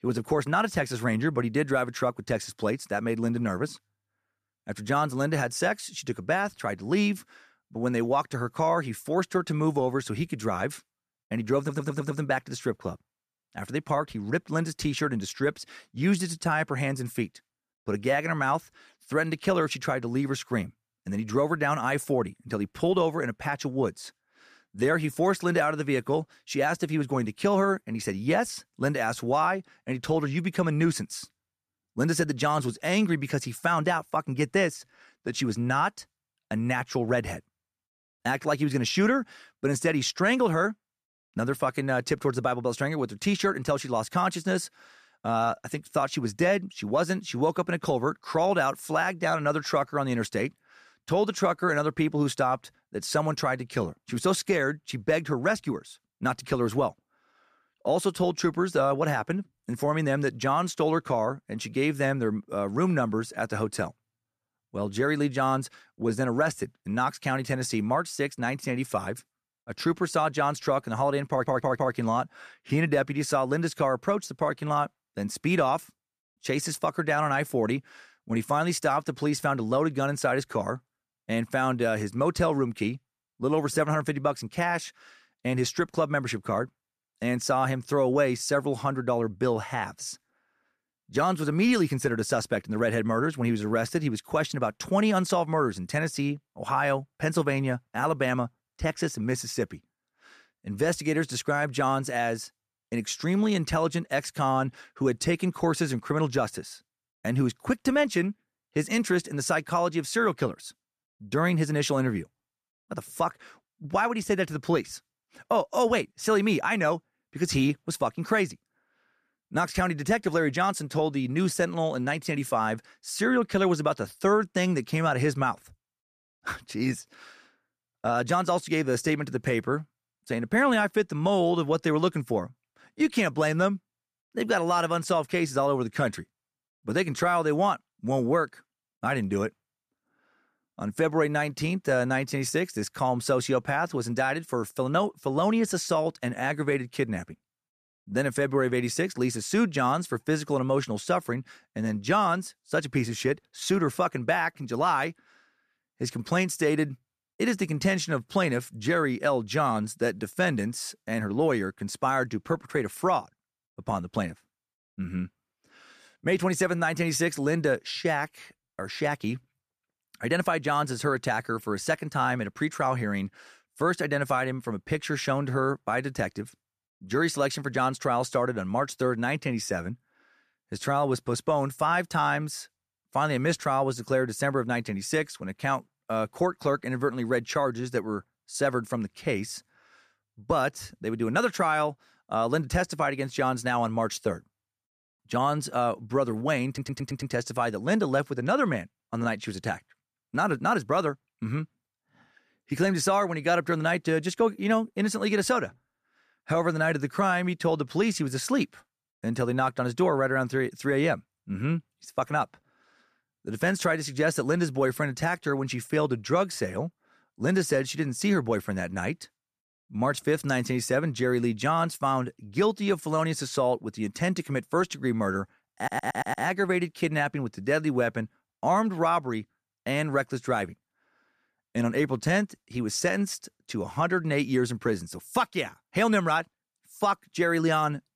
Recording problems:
audio stuttering; 4 times, first at 12 s

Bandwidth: 14.5 kHz